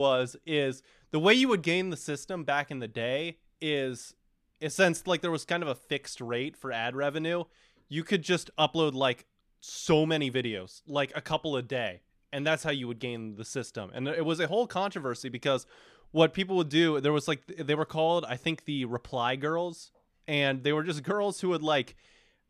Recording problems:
abrupt cut into speech; at the start

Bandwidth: 14.5 kHz